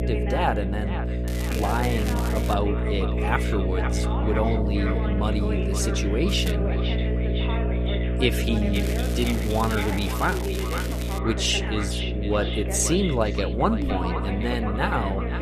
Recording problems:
echo of what is said; strong; throughout; 510 ms later, 10 dB below the speech
electrical hum; loud; throughout; 60 Hz, 7 dB below the speech
voice in the background; loud; throughout; 8 dB below the speech
crackling; noticeable; from 1.5 to 2.5 s, at 6.5 s and from 8.5 to 11 s; 10 dB below the speech

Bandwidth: 14.5 kHz